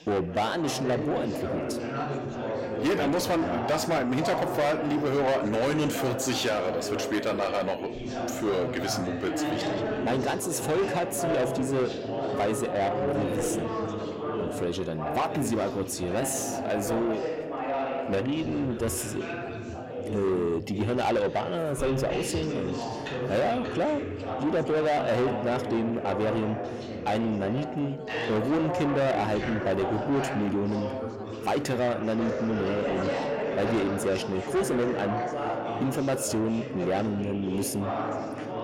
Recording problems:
distortion; heavy; 8 dB below the speech
background chatter; loud; throughout; 4 voices, 4 dB below the speech

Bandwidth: 16 kHz